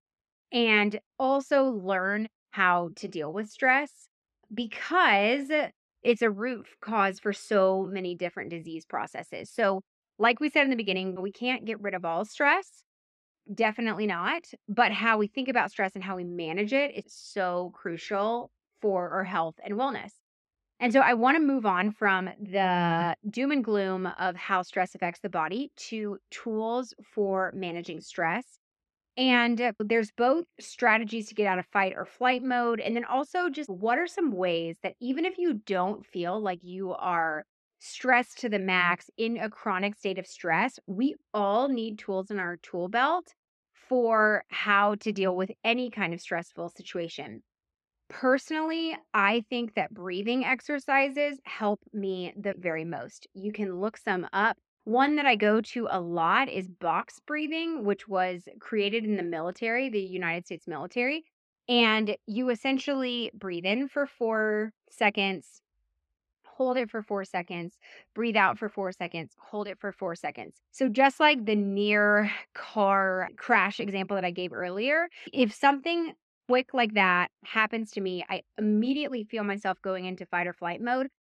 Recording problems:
muffled; slightly; fading above 3 kHz

